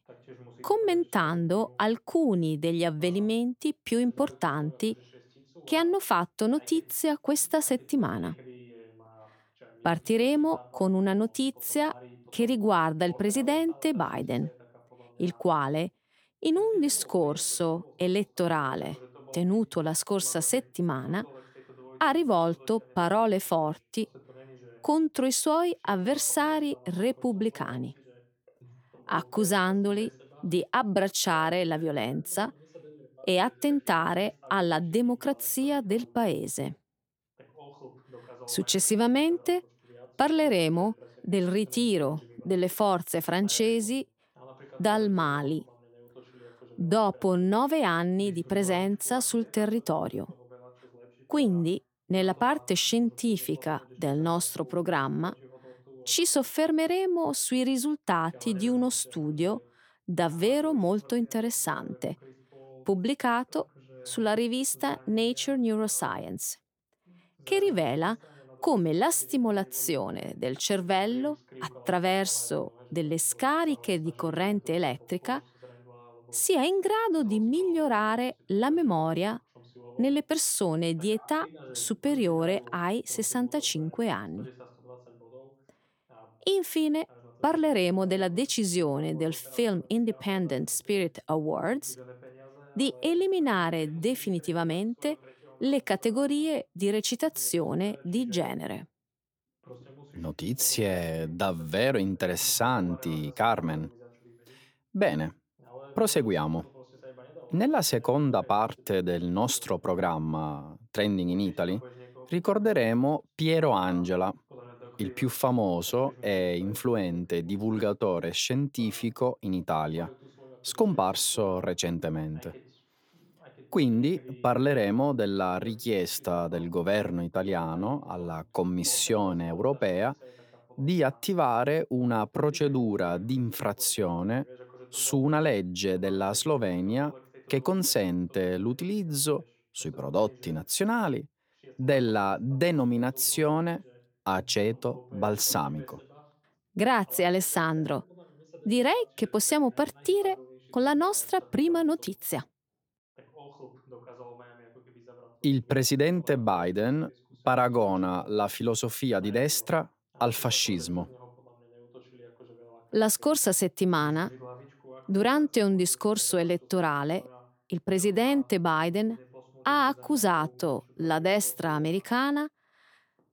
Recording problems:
voice in the background; faint; throughout; 25 dB below the speech

